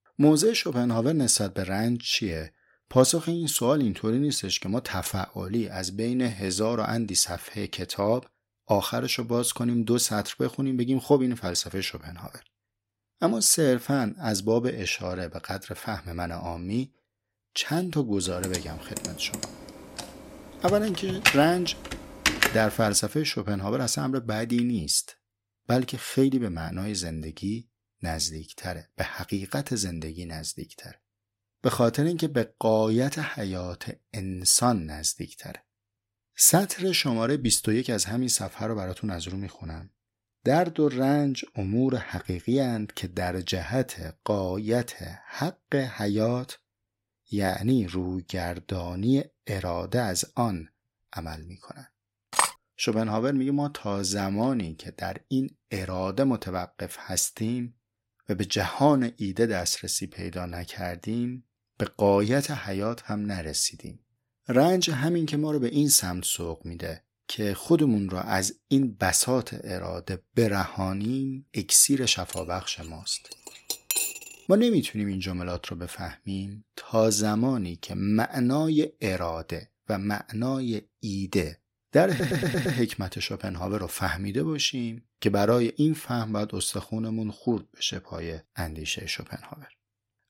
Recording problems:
keyboard typing; loud; from 18 to 22 s; peak 4 dB above the speech
clattering dishes; loud; at 52 s and from 1:12 to 1:14; peak 2 dB above the speech
audio stuttering; at 1:22

